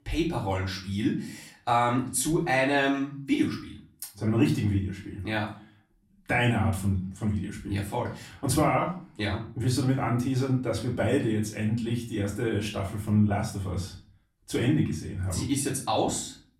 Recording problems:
off-mic speech; far
room echo; slight; dies away in 0.4 s

